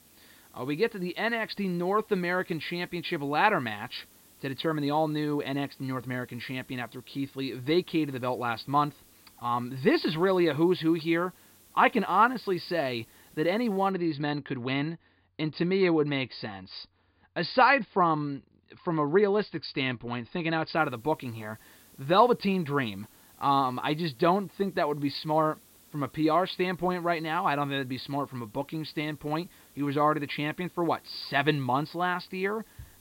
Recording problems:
high frequencies cut off; severe; nothing above 5 kHz
hiss; faint; until 14 s and from 21 s on; 25 dB below the speech

